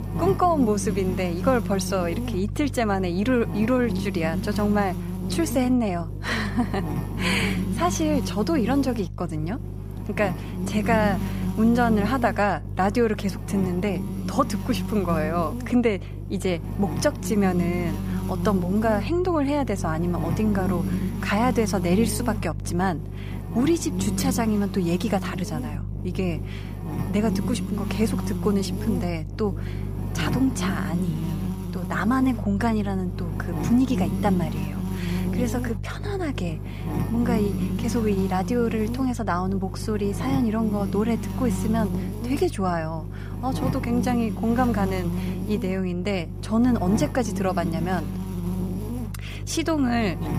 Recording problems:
electrical hum; loud; throughout; 50 Hz, 10 dB below the speech

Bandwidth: 15 kHz